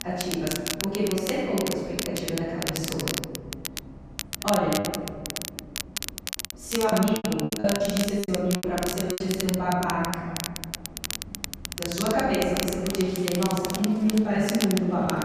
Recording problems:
room echo; strong; dies away in 1.8 s
off-mic speech; far
crackle, like an old record; loud; 6 dB below the speech
traffic noise; noticeable; throughout; 15 dB below the speech
choppy; very; from 7 to 9 s; 15% of the speech affected

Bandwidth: 14.5 kHz